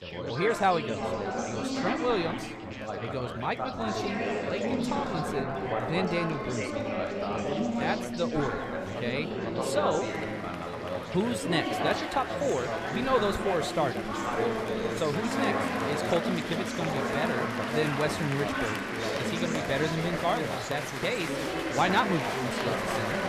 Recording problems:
chatter from many people; very loud; throughout; as loud as the speech

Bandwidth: 14.5 kHz